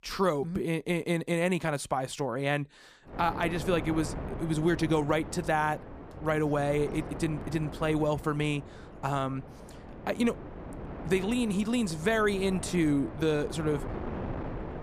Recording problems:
wind noise on the microphone; occasional gusts; from 3 s on; 15 dB below the speech

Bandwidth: 15 kHz